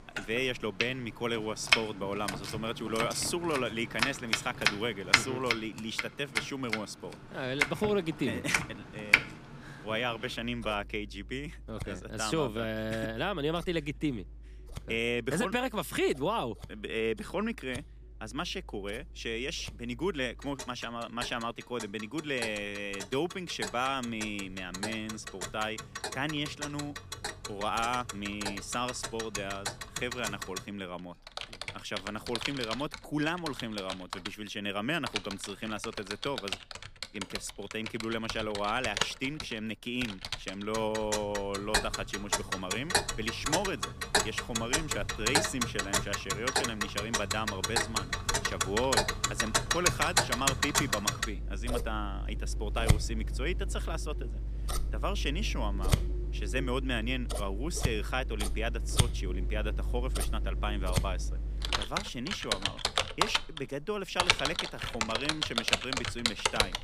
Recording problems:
household noises; very loud; throughout; 2 dB above the speech

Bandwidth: 15 kHz